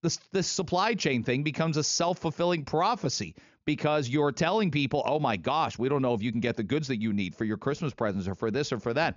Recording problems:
high frequencies cut off; noticeable; nothing above 7 kHz

